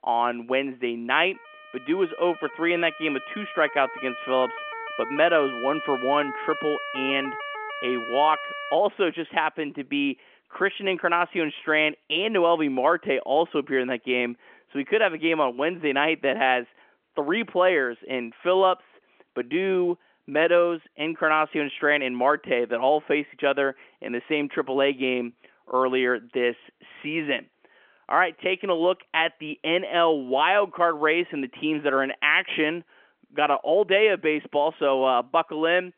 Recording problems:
phone-call audio; nothing above 3.5 kHz
siren; noticeable; from 1.5 to 9 s; peak 8 dB below the speech

